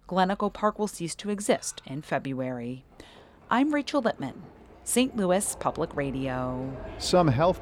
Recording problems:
animal sounds; noticeable; throughout; 20 dB below the speech

